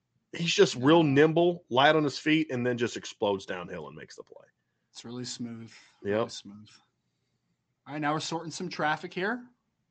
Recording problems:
high frequencies cut off; noticeable; nothing above 8 kHz

